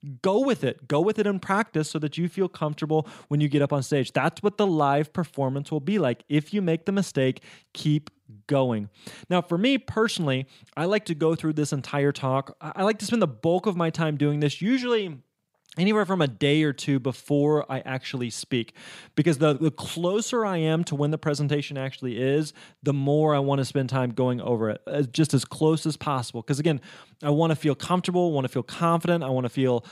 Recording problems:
none

